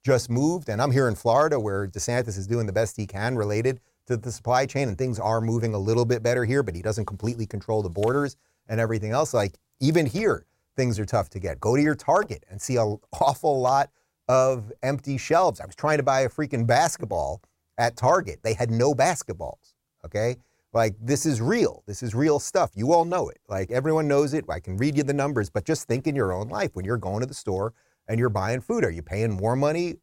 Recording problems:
none

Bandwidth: 16 kHz